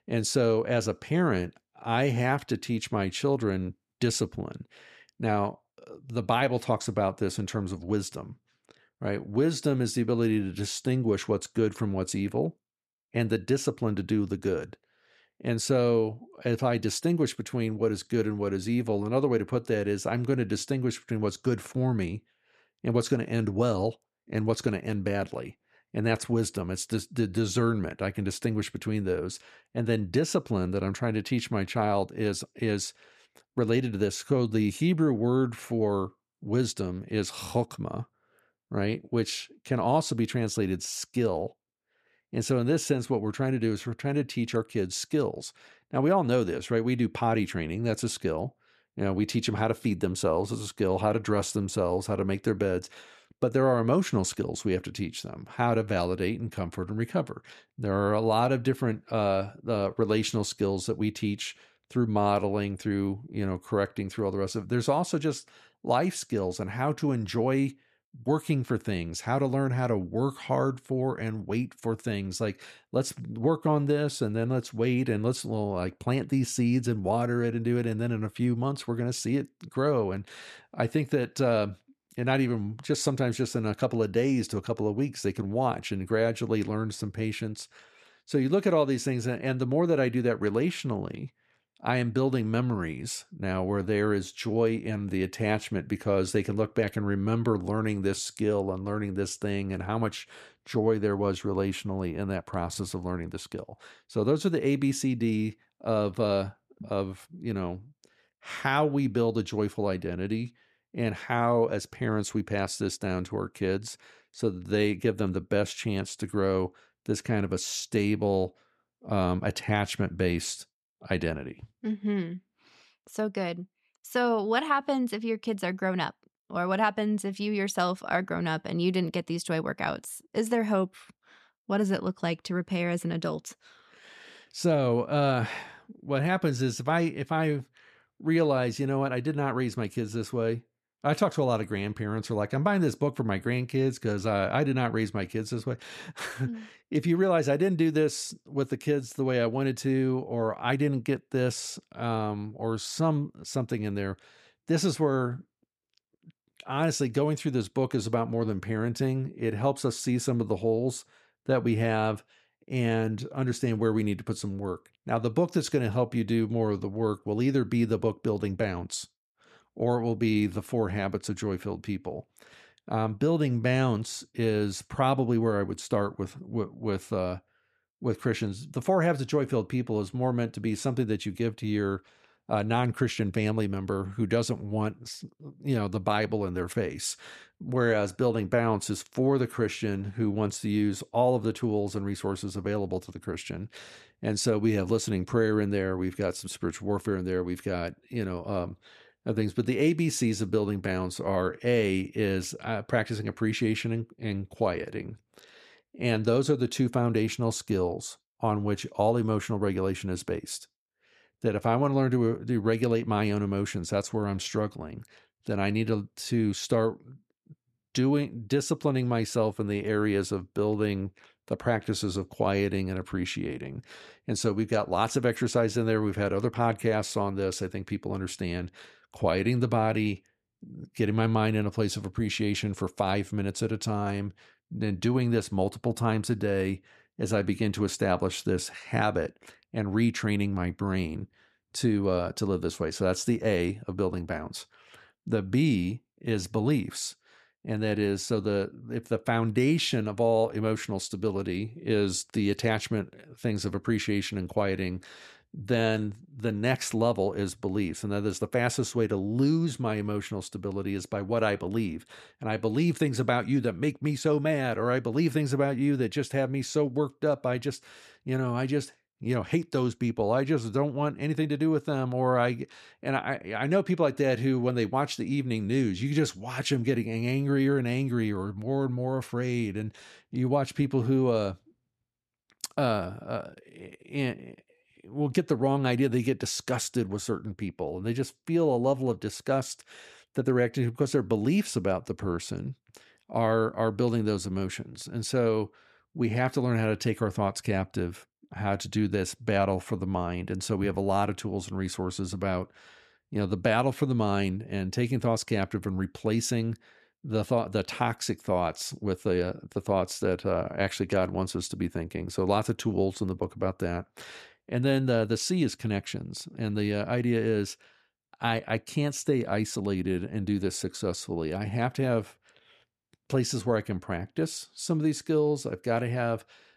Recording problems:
none

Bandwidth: 13.5 kHz